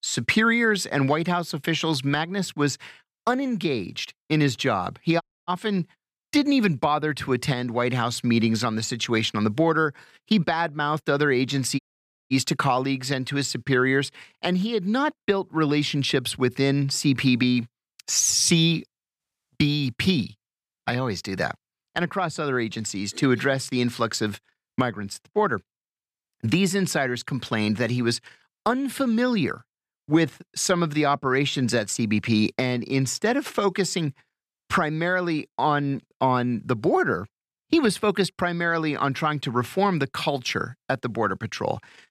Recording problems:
audio cutting out; at 5 s and at 12 s for 0.5 s

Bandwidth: 14.5 kHz